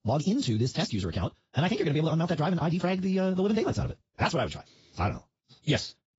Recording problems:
garbled, watery; badly; nothing above 7.5 kHz
wrong speed, natural pitch; too fast; 1.8 times normal speed

